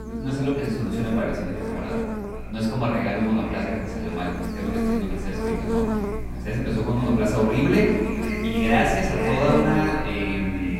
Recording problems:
off-mic speech; far
echo of what is said; noticeable; throughout; 500 ms later, 15 dB below the speech
room echo; noticeable; dies away in 1.2 s
electrical hum; loud; throughout; 60 Hz, 5 dB below the speech

